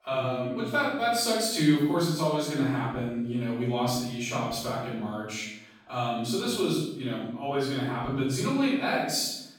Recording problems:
room echo; strong; dies away in 0.8 s
off-mic speech; far

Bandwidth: 17.5 kHz